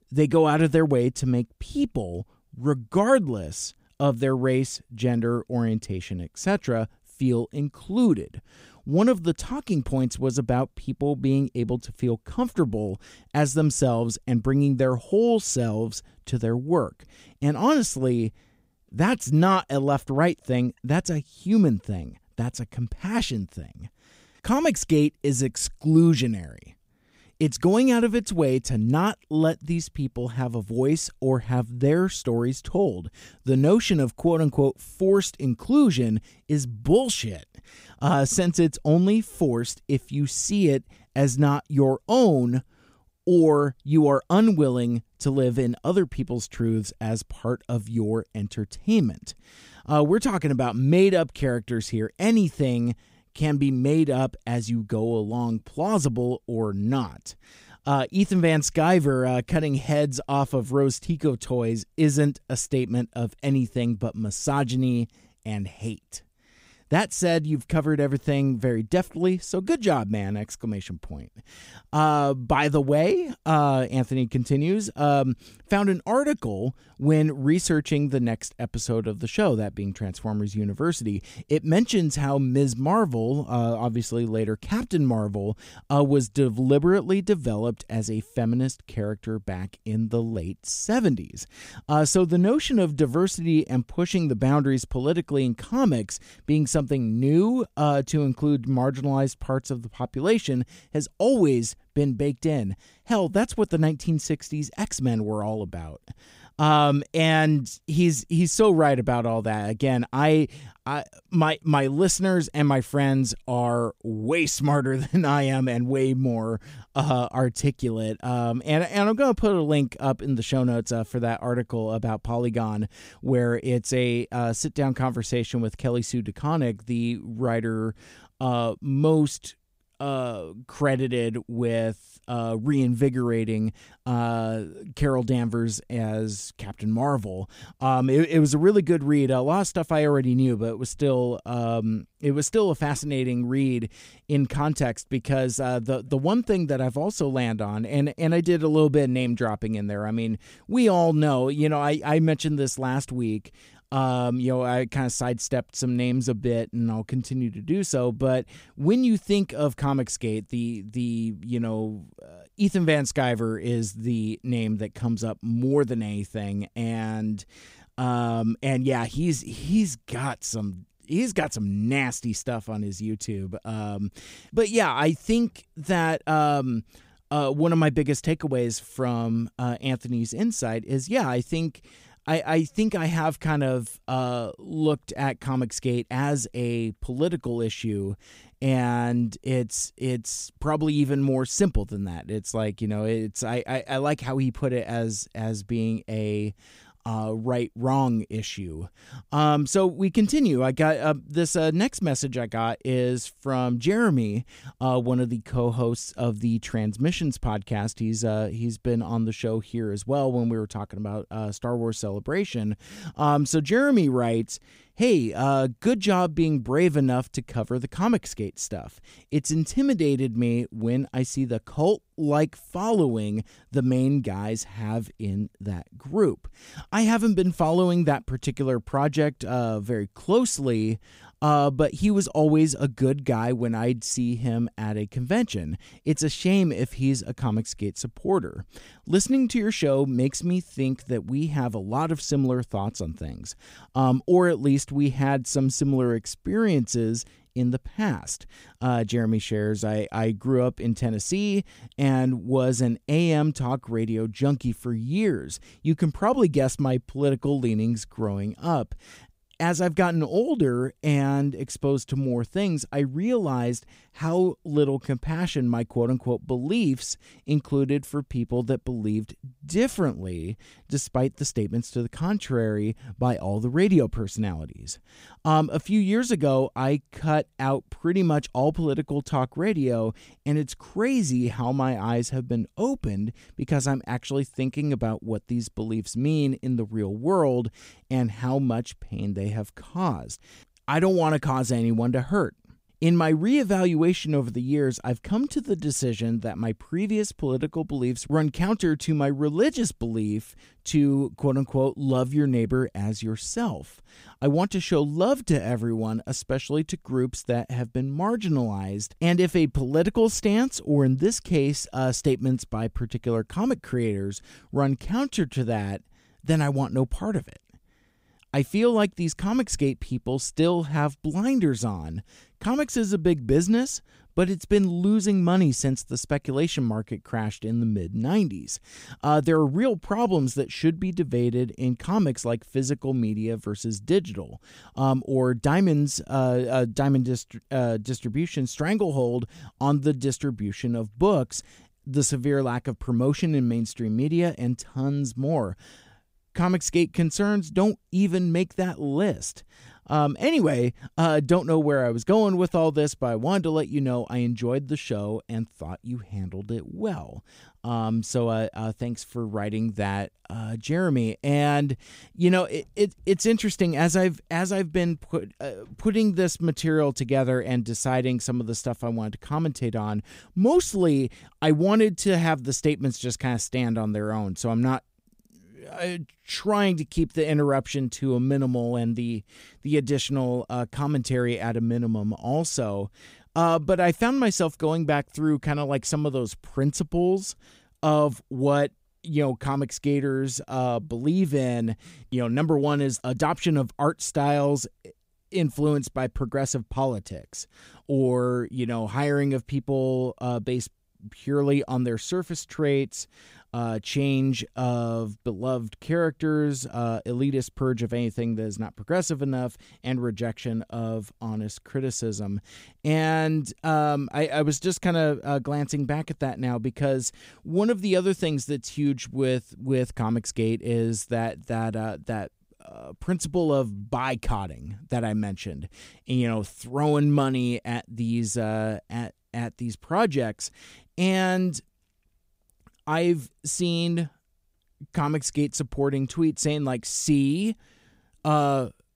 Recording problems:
none

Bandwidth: 15.5 kHz